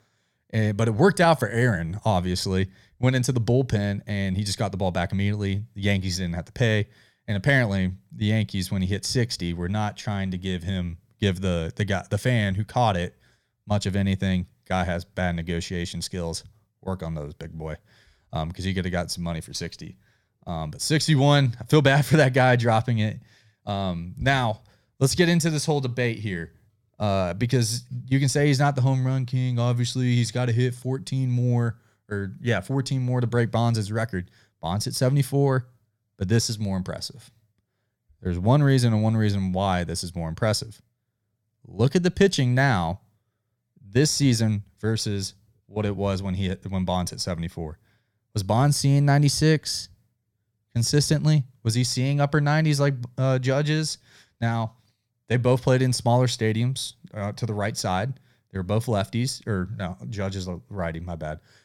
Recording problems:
none

